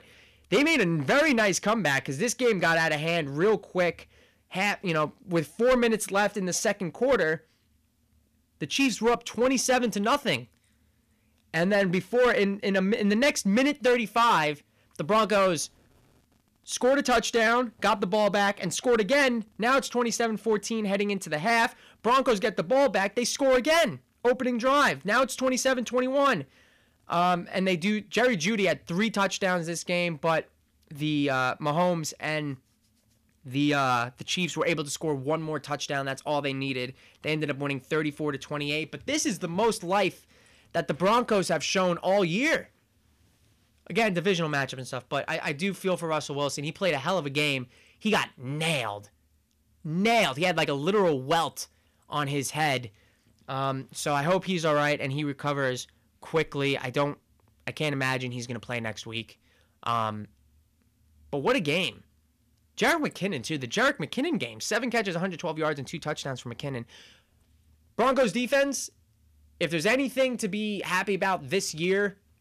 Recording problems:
distortion; slight; 4% of the sound clipped

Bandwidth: 14.5 kHz